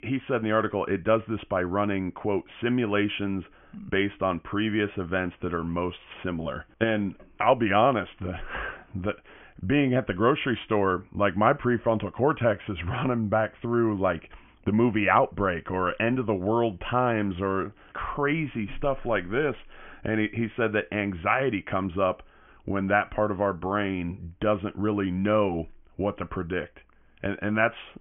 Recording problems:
high frequencies cut off; severe; nothing above 3 kHz

